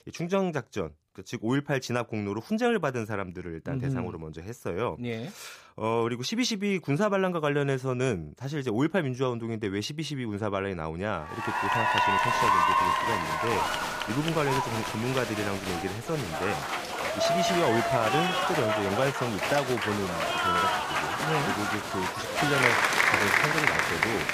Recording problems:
crowd noise; very loud; from 11 s on; 4 dB above the speech

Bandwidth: 15 kHz